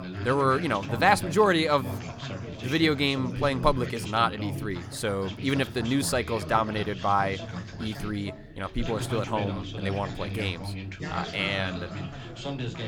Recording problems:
background chatter; loud; throughout; 3 voices, 9 dB below the speech

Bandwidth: 18.5 kHz